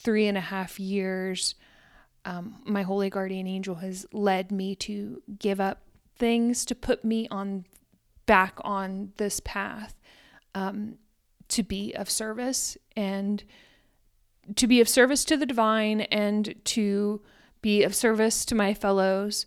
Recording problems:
none

